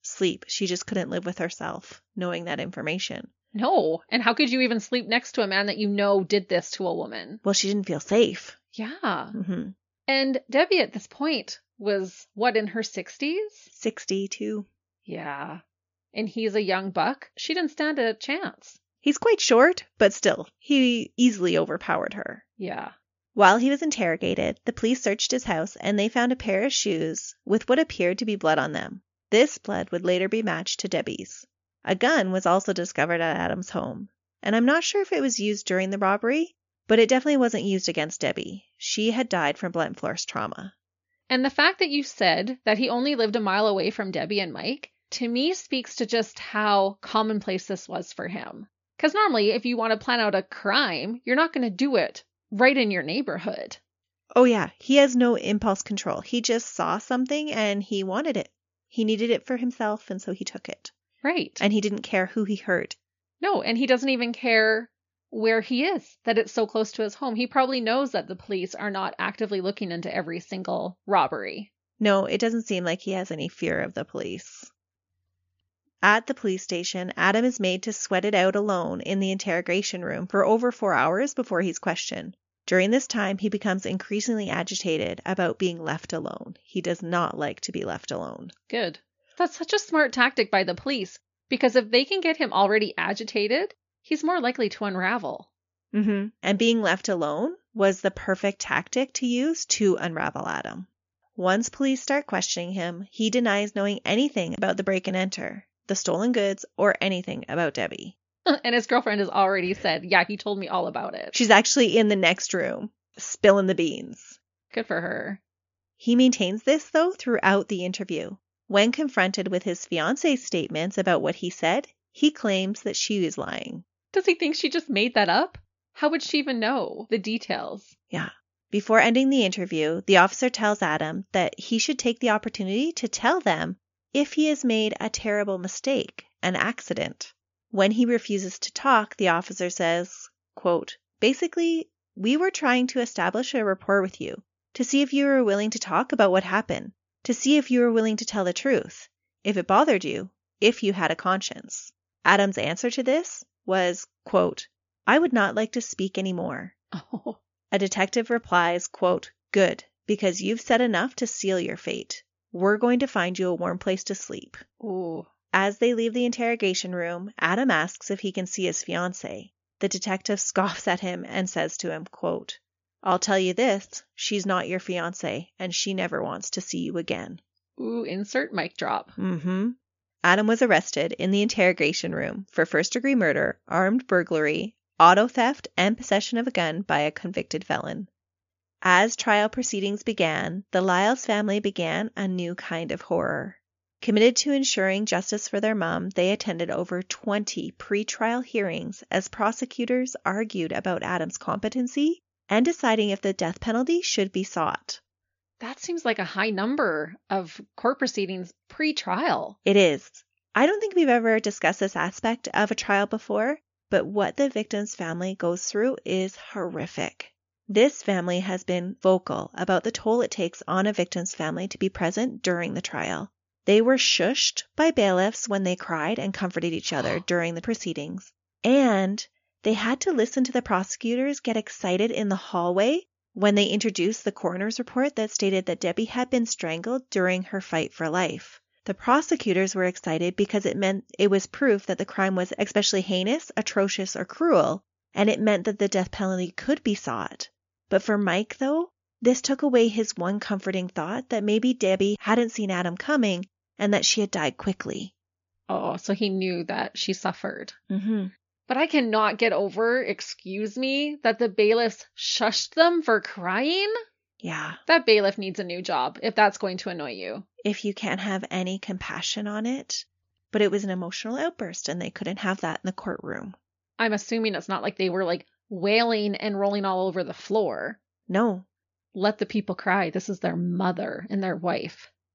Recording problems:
high frequencies cut off; noticeable; nothing above 7 kHz

